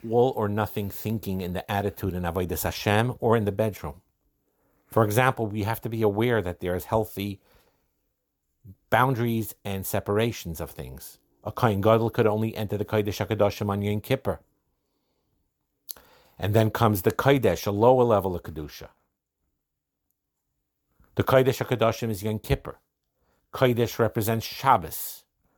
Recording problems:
none

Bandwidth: 18.5 kHz